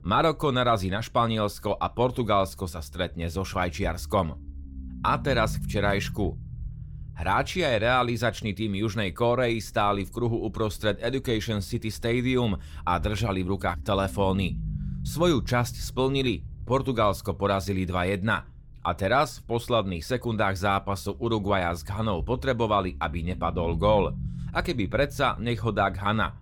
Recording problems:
low rumble; faint; throughout; 25 dB below the speech

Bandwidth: 17 kHz